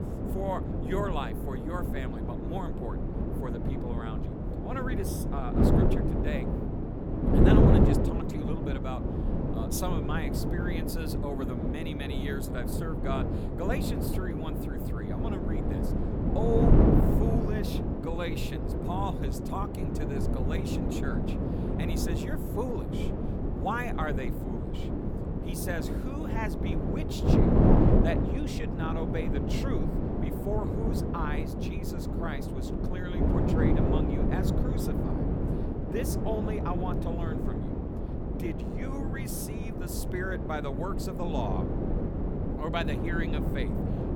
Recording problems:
wind noise on the microphone; heavy; 2 dB above the speech

